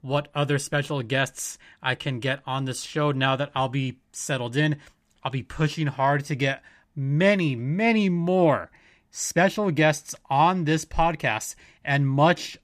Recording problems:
none

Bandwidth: 14.5 kHz